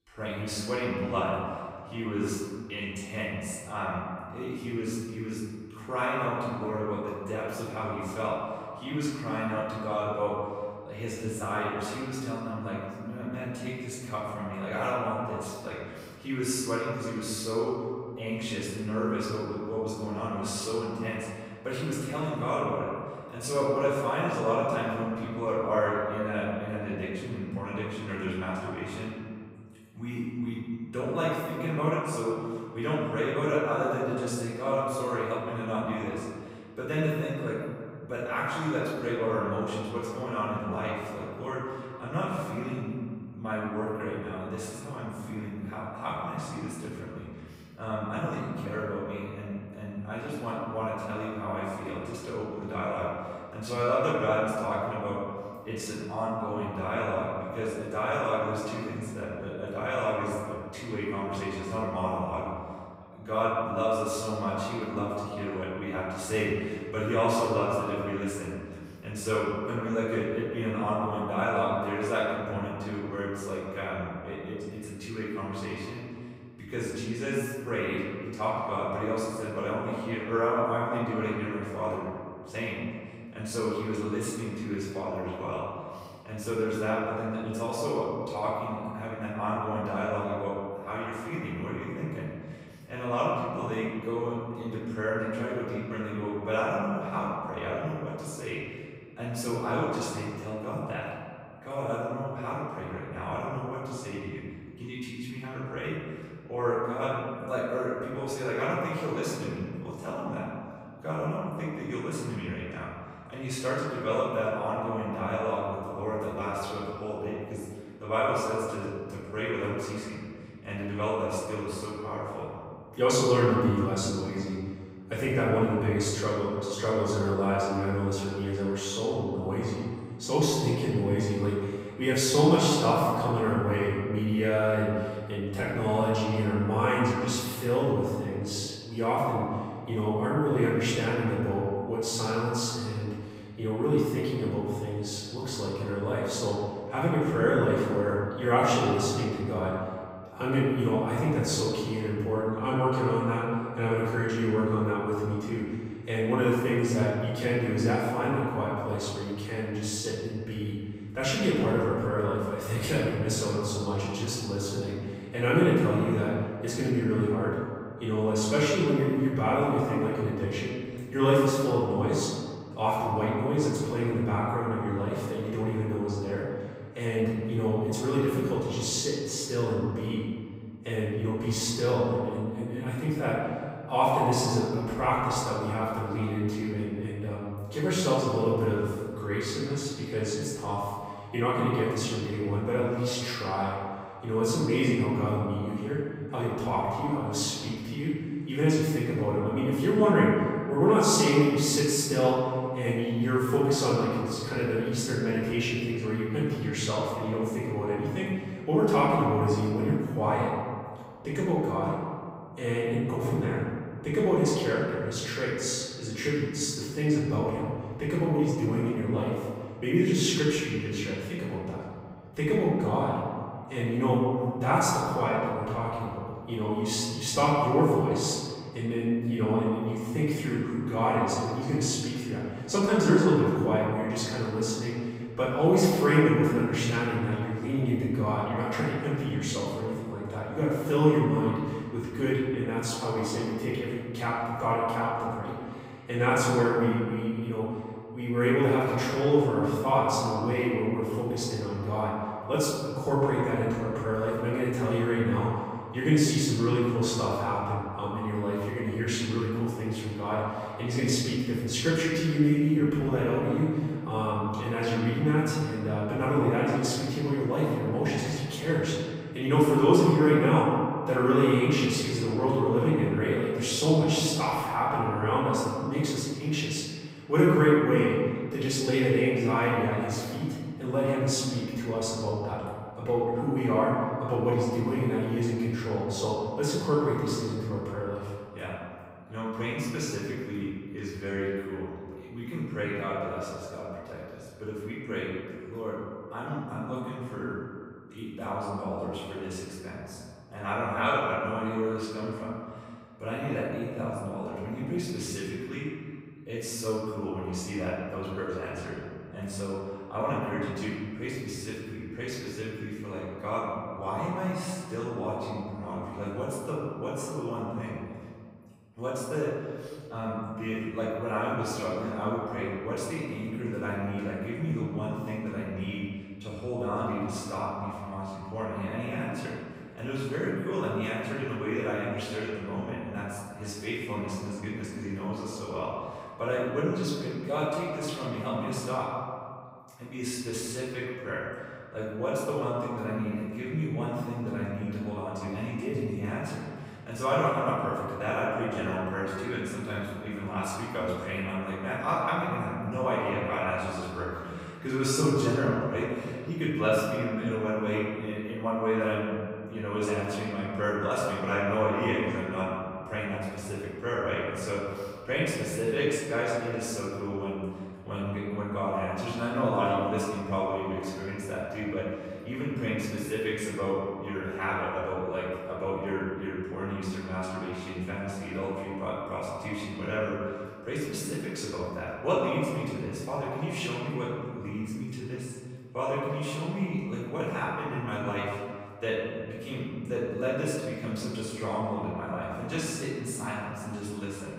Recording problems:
room echo; strong; dies away in 1.9 s
off-mic speech; far

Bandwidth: 15.5 kHz